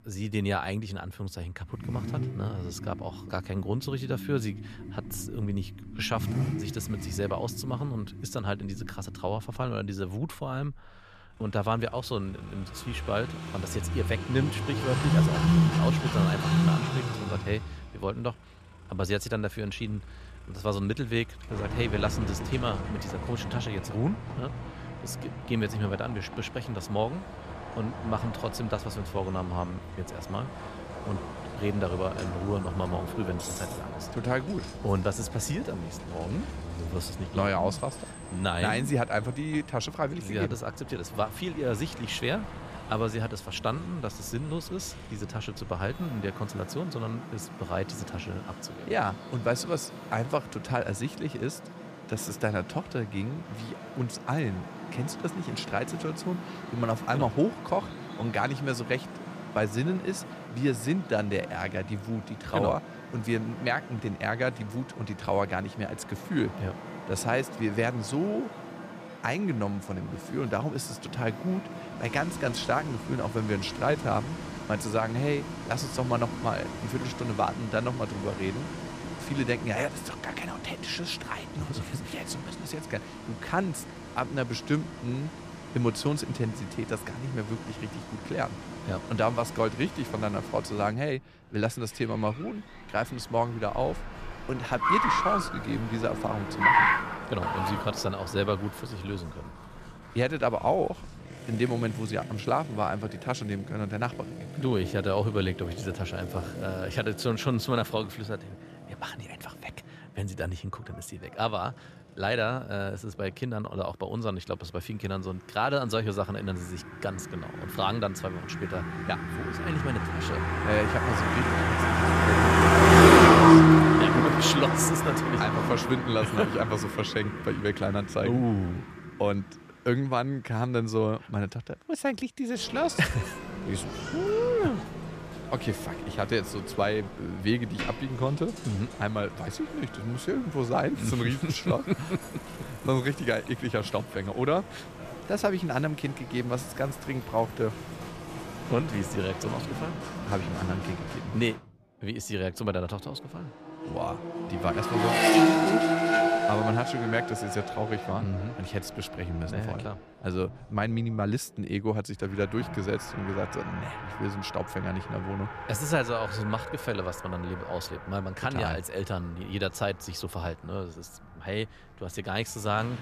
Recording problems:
traffic noise; very loud; throughout; 2 dB above the speech

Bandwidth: 14.5 kHz